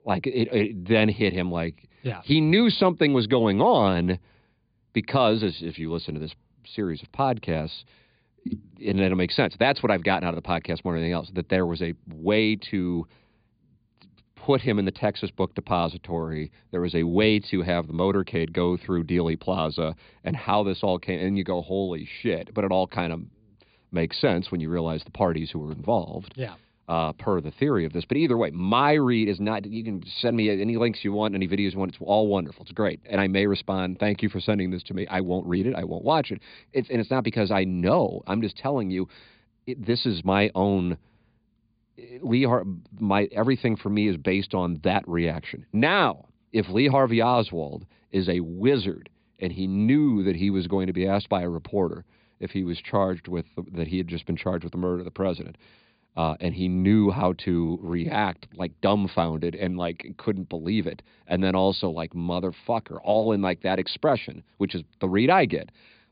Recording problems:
high frequencies cut off; severe; nothing above 5 kHz

